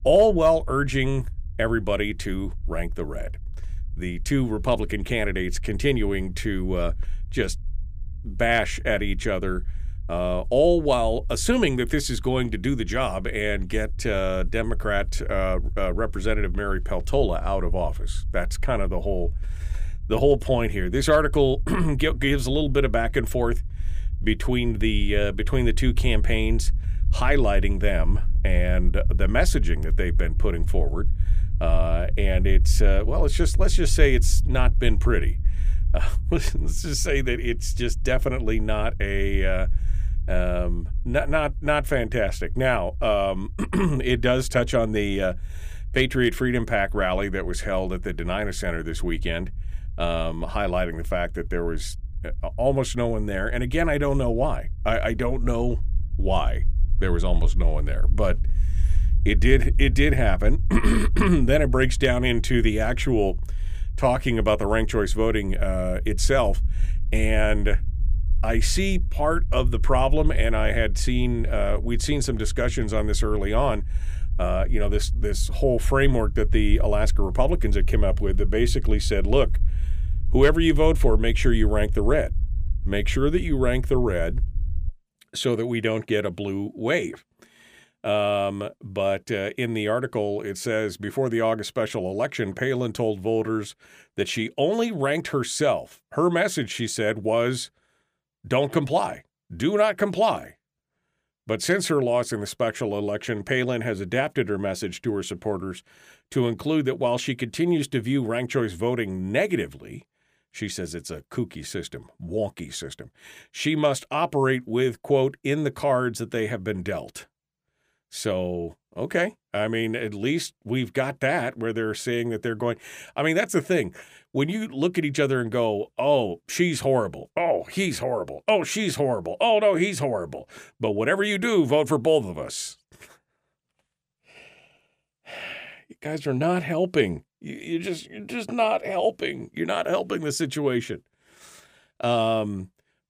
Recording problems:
low rumble; faint; until 1:25; 25 dB below the speech

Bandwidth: 15 kHz